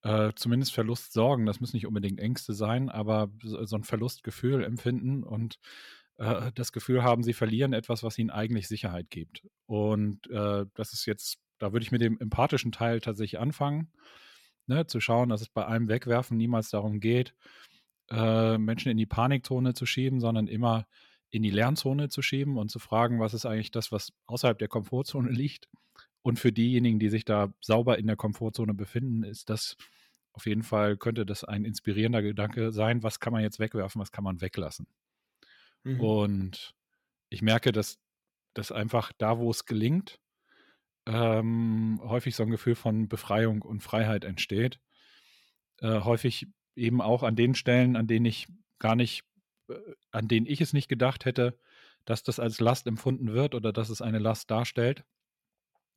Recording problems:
none

